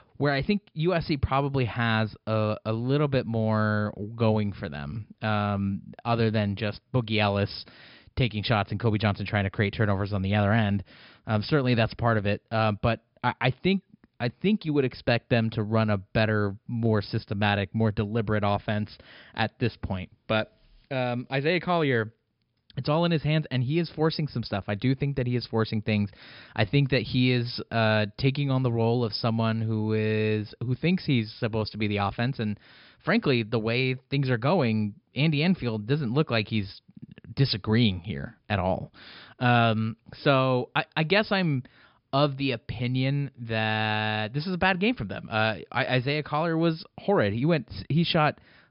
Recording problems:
high frequencies cut off; noticeable; nothing above 5.5 kHz

